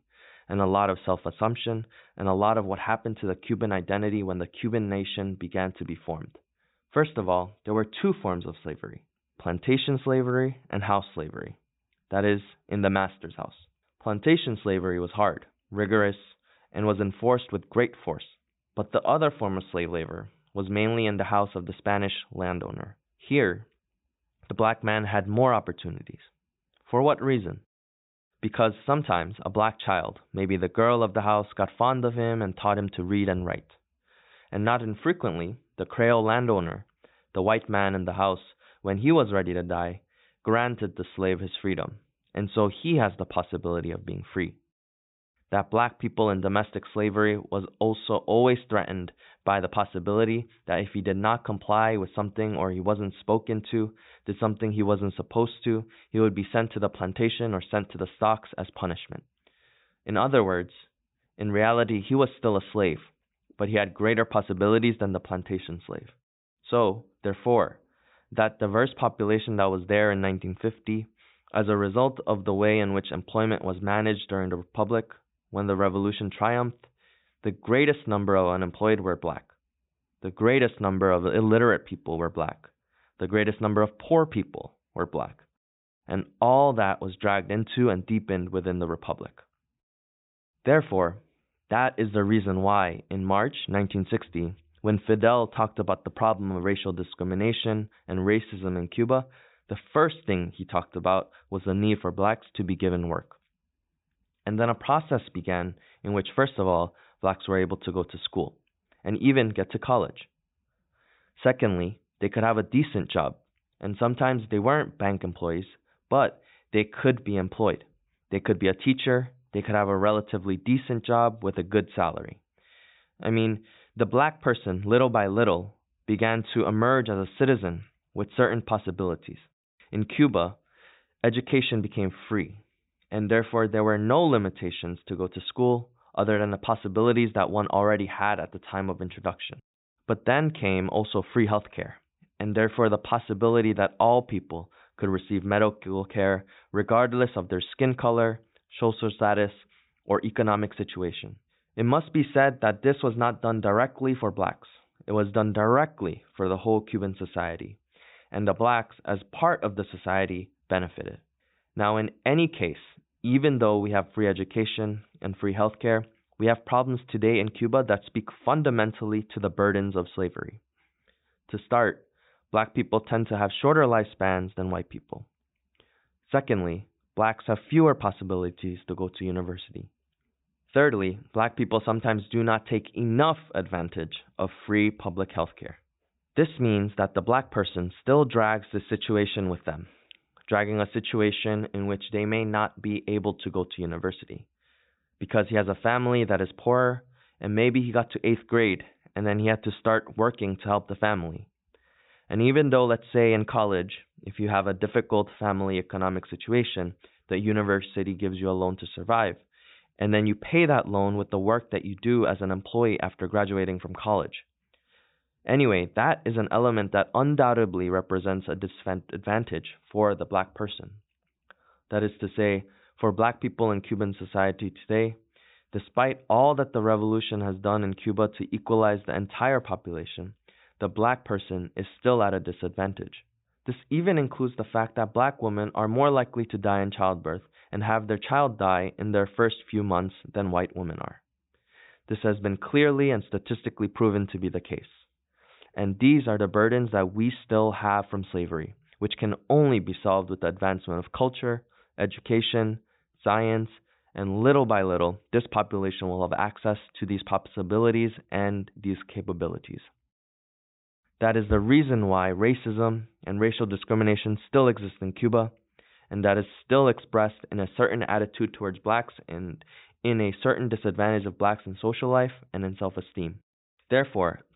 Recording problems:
high frequencies cut off; severe; nothing above 4 kHz

